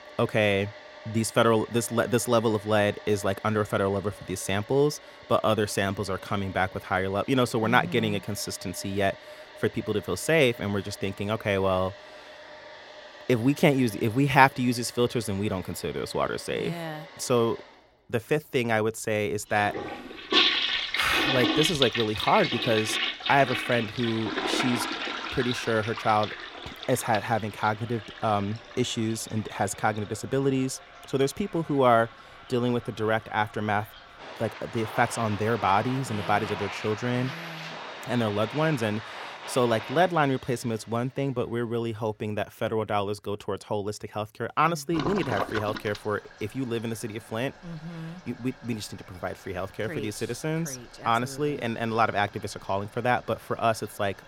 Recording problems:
household noises; loud; throughout; 5 dB below the speech

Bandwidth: 16.5 kHz